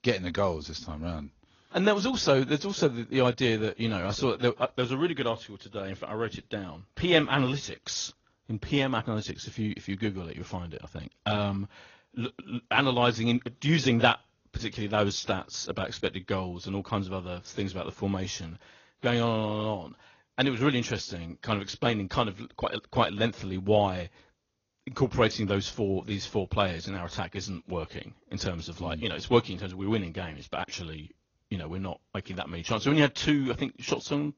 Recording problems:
garbled, watery; slightly; nothing above 6.5 kHz

